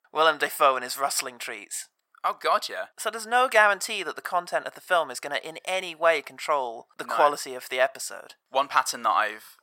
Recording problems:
thin; very; fading below 700 Hz

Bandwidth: 16.5 kHz